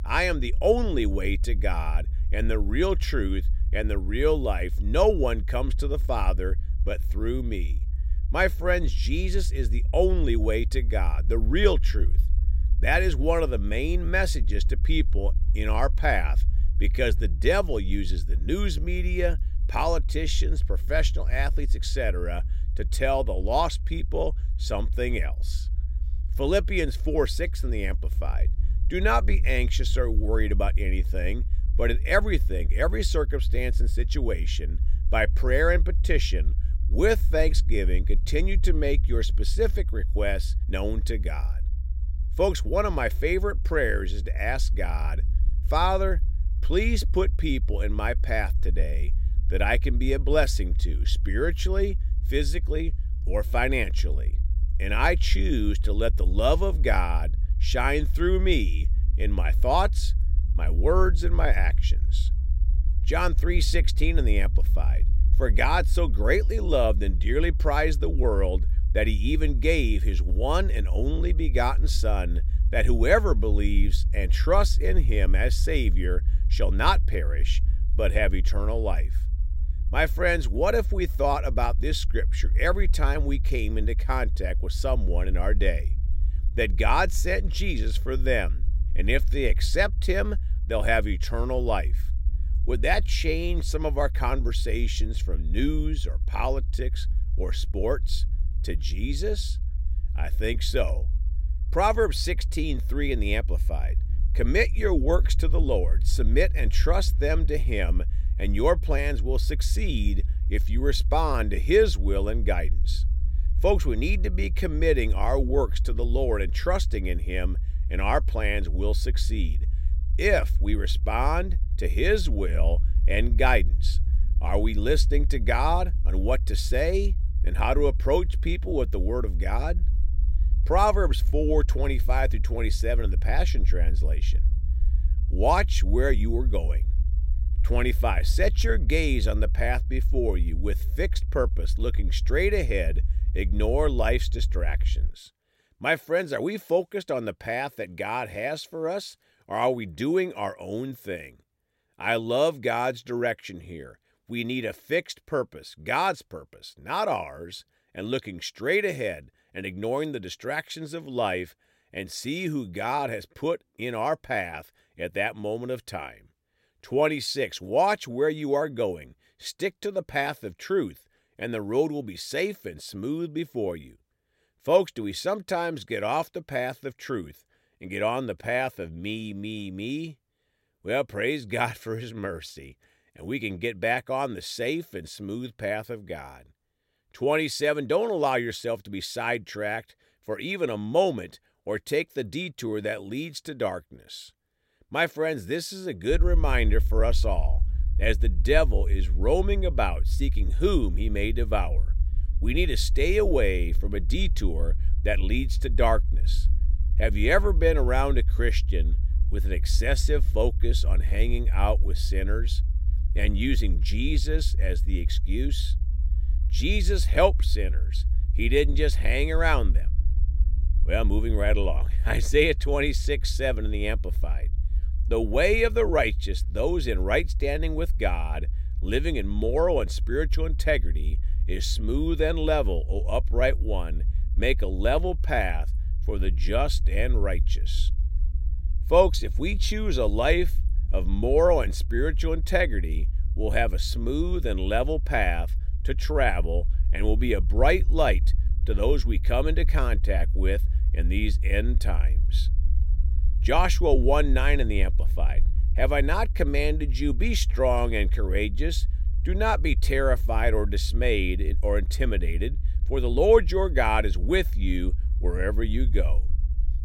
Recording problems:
low rumble; faint; until 2:25 and from 3:16 on; 20 dB below the speech

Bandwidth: 16 kHz